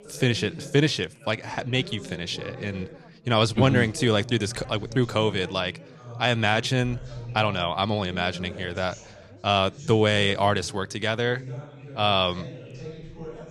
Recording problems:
background chatter; noticeable; throughout; 4 voices, 15 dB below the speech

